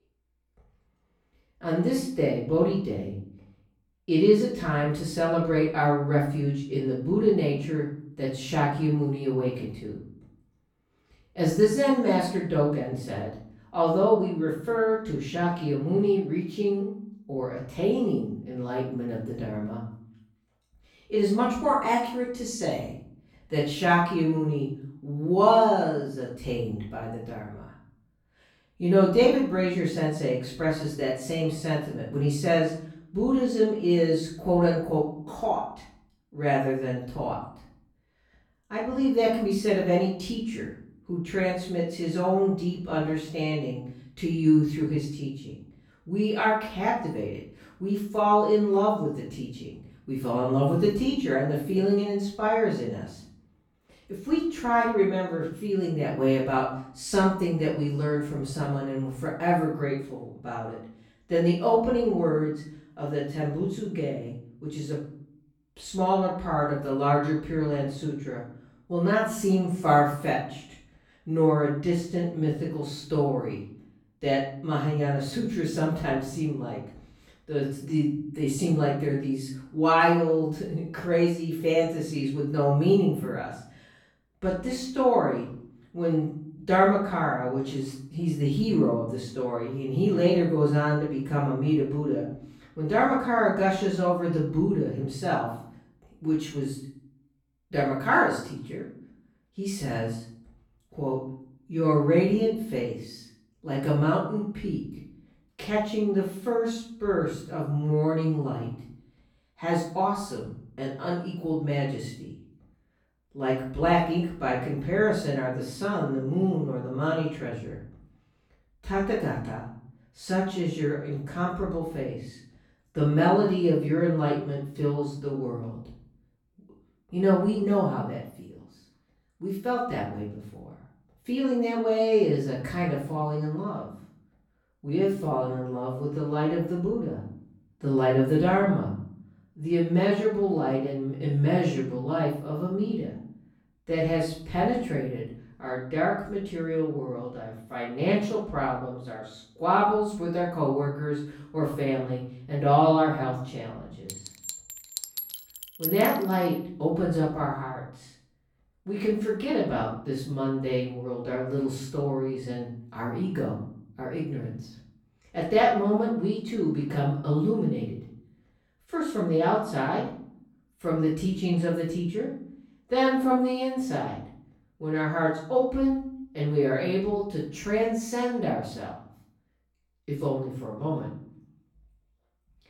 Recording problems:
off-mic speech; far
room echo; noticeable; dies away in 0.6 s
clattering dishes; noticeable; from 2:34 to 2:36; peak 3 dB below the speech

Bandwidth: 17.5 kHz